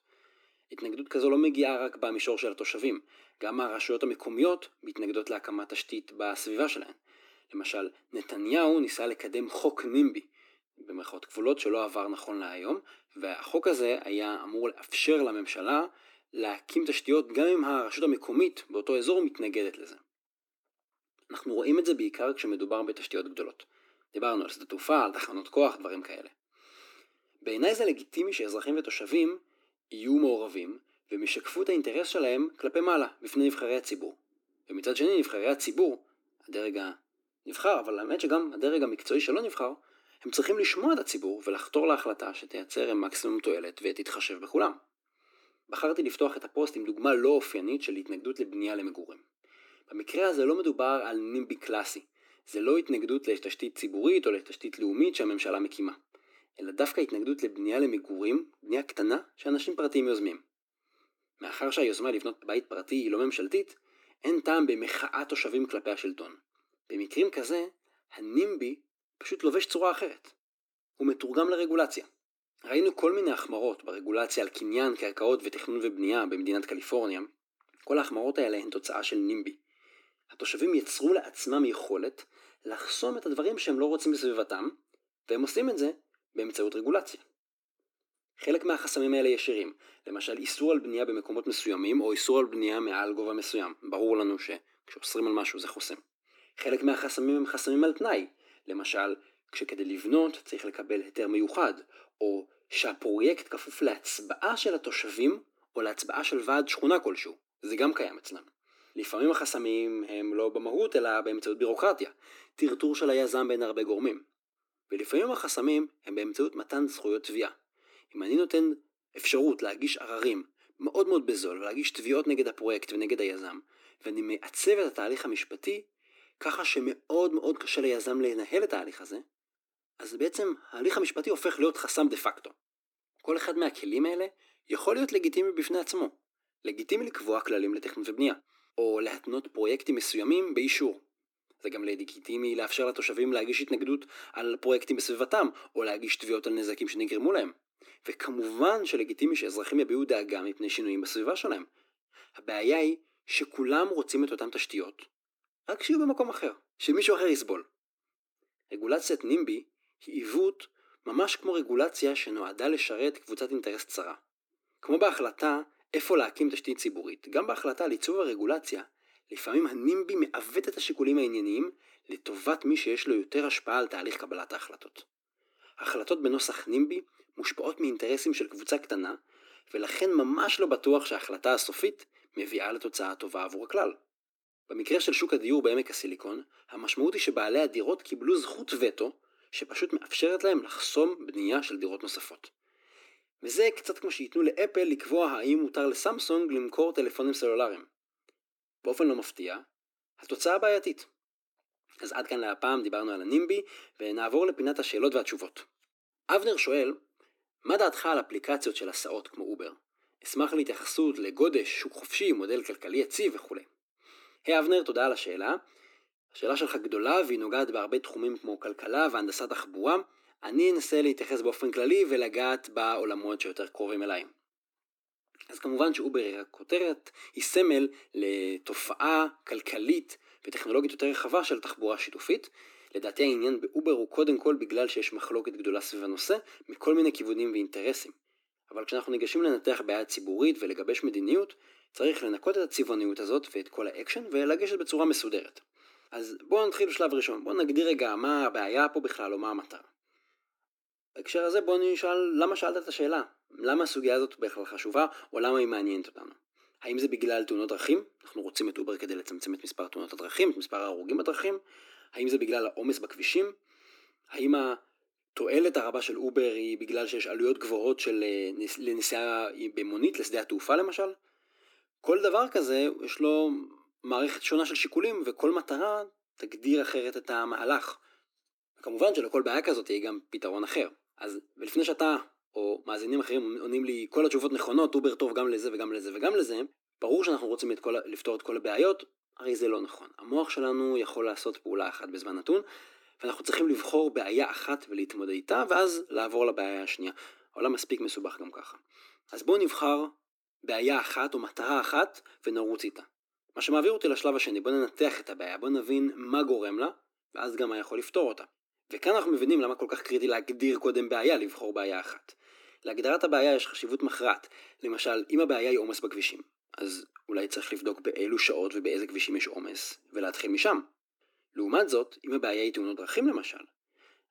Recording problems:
thin; somewhat; fading below 300 Hz

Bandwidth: 17.5 kHz